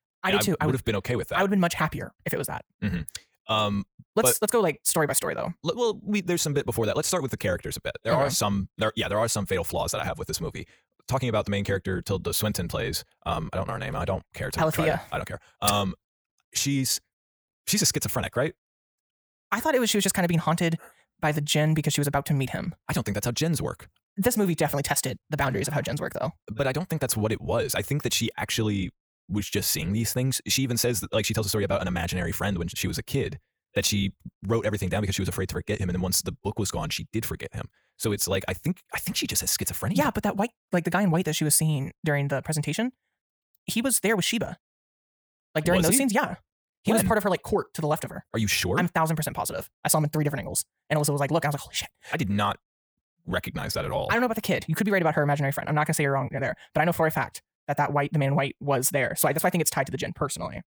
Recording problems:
wrong speed, natural pitch; too fast; 1.6 times normal speed

